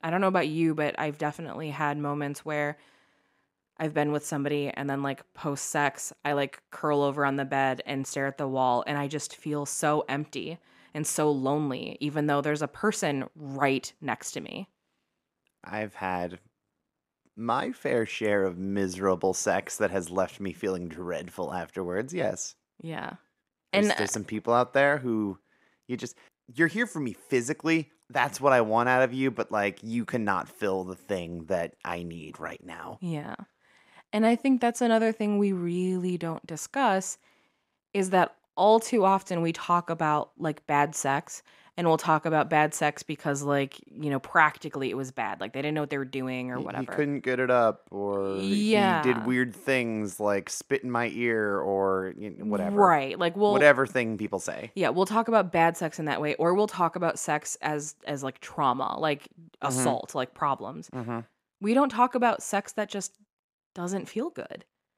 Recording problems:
none

